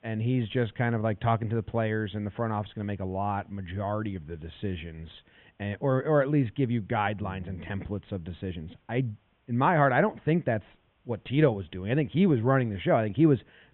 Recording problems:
high frequencies cut off; severe; nothing above 3.5 kHz
hiss; very faint; throughout; 40 dB below the speech

